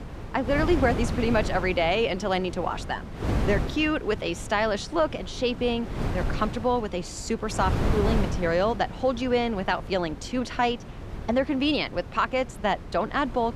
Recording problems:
wind noise on the microphone; occasional gusts; 10 dB below the speech

